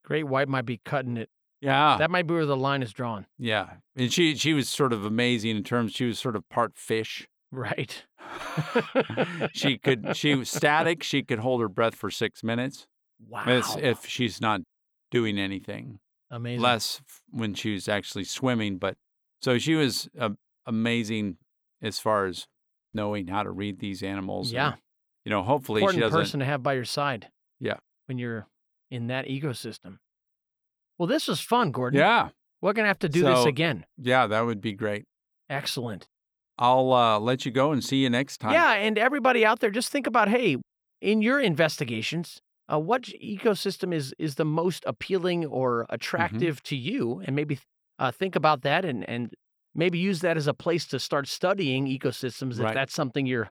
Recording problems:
none

